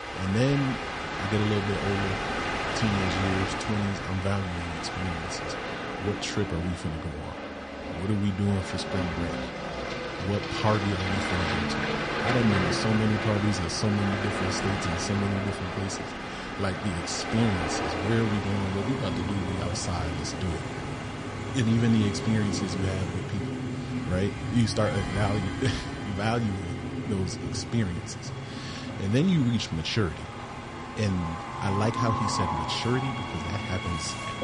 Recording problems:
garbled, watery; slightly; nothing above 10 kHz
train or aircraft noise; loud; throughout; 3 dB below the speech

